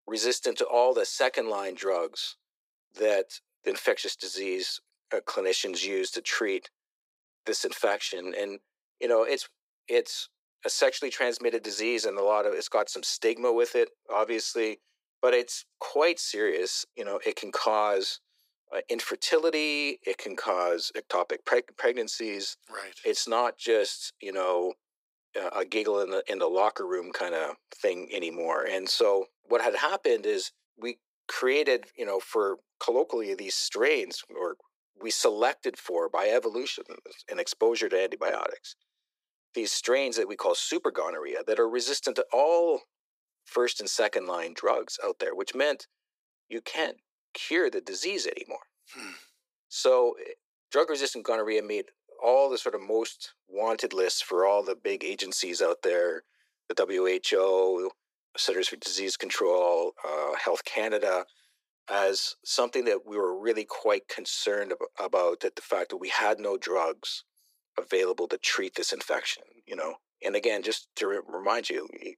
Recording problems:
thin; very; fading below 350 Hz

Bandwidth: 15.5 kHz